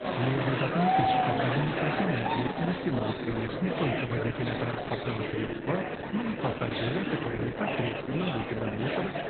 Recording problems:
garbled, watery; badly; nothing above 4 kHz
murmuring crowd; very loud; throughout; 1 dB above the speech

